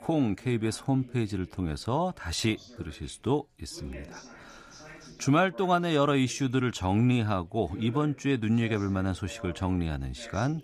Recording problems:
background chatter; faint; throughout; 3 voices, 20 dB below the speech

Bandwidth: 15 kHz